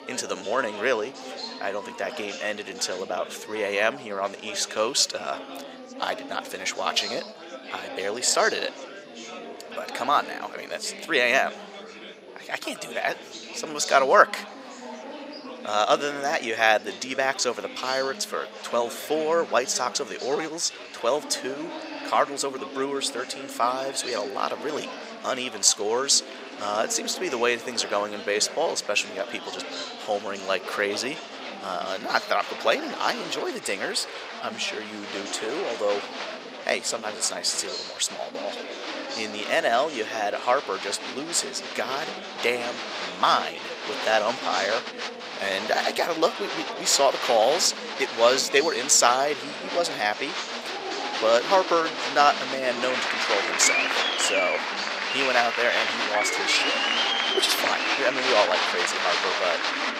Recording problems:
thin; somewhat; fading below 550 Hz
chatter from many people; loud; throughout; 5 dB below the speech

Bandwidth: 15.5 kHz